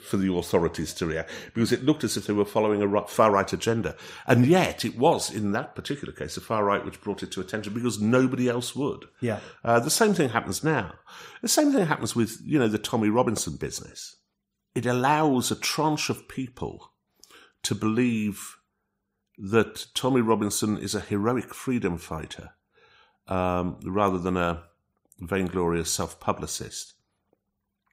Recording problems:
none

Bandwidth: 15.5 kHz